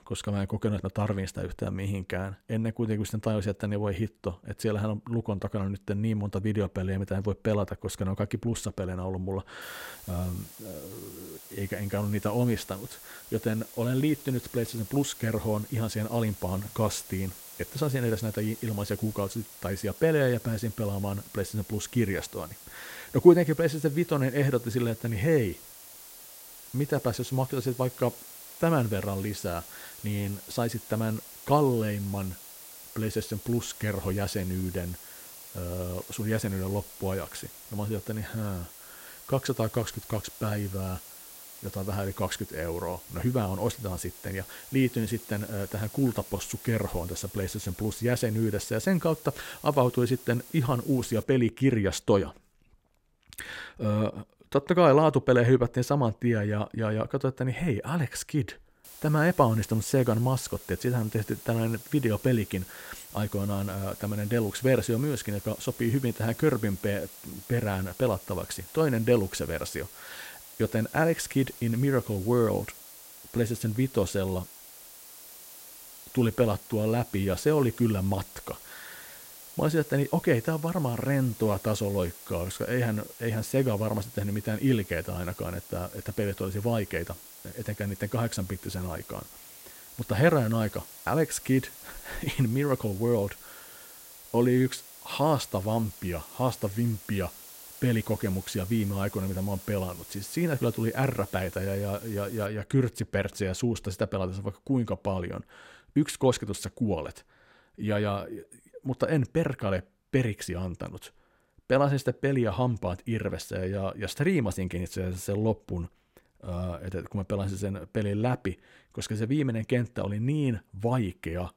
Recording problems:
hiss; noticeable; from 9.5 to 51 s and from 59 s to 1:42; 15 dB below the speech

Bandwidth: 16 kHz